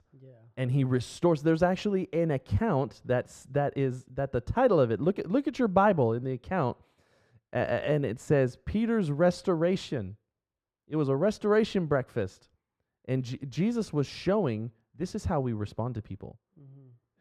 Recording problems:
muffled; very; fading above 3.5 kHz

